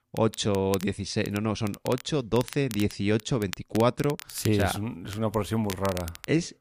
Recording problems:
crackle, like an old record; noticeable; 15 dB below the speech

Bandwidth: 15 kHz